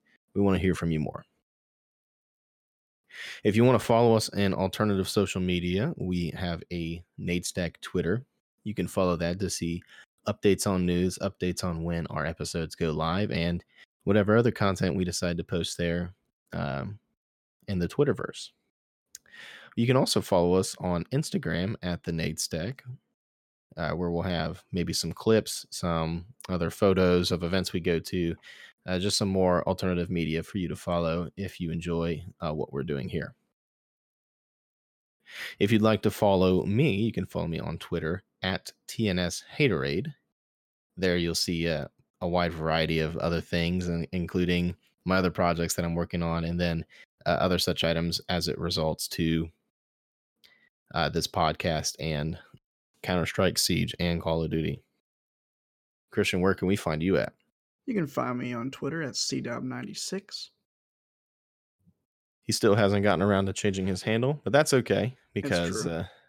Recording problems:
none

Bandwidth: 17 kHz